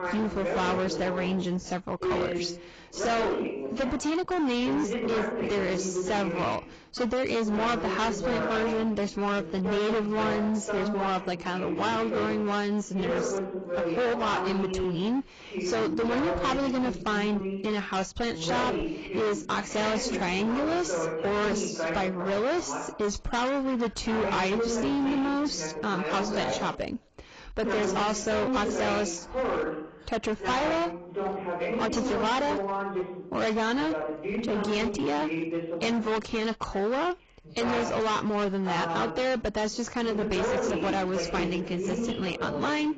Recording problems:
distortion; heavy; 25% of the sound clipped
garbled, watery; badly; nothing above 7.5 kHz
voice in the background; loud; throughout; 3 dB below the speech

